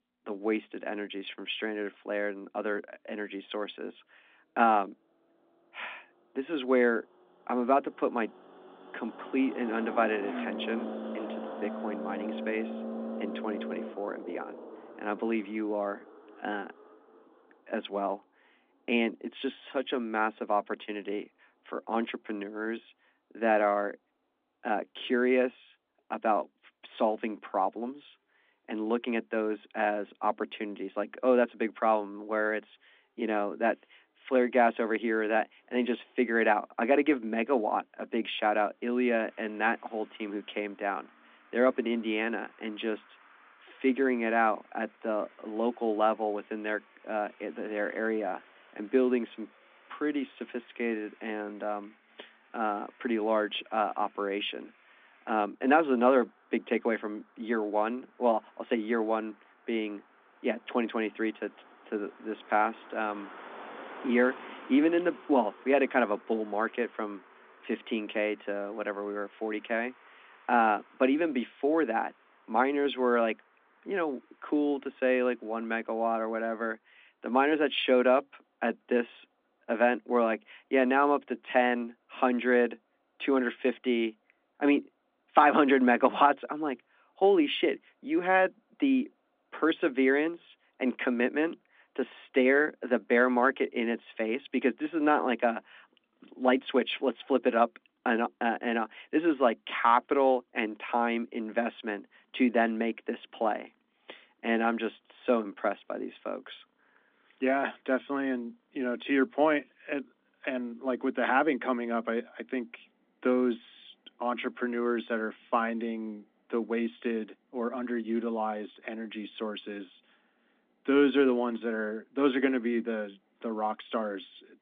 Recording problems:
phone-call audio; nothing above 3.5 kHz
traffic noise; noticeable; throughout; 15 dB below the speech

